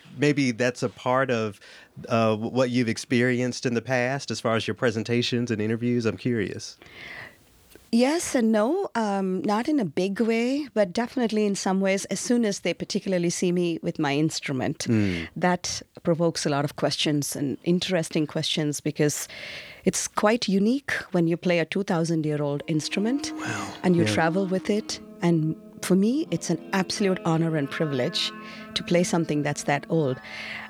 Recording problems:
background music; noticeable; from 23 s on; 15 dB below the speech

